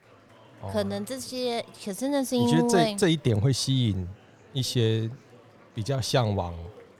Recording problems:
murmuring crowd; faint; throughout; 25 dB below the speech

